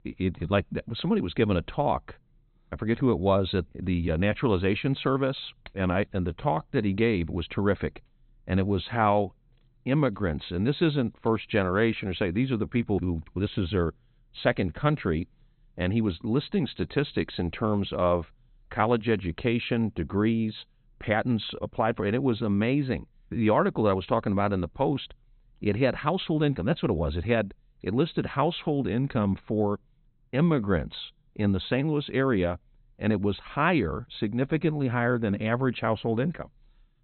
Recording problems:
high frequencies cut off; severe; nothing above 4 kHz

